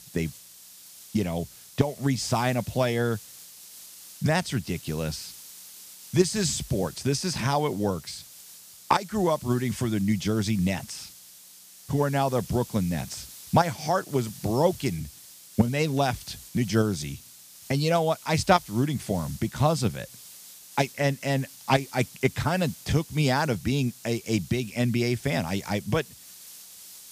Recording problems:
hiss; noticeable; throughout; 15 dB below the speech

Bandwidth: 15 kHz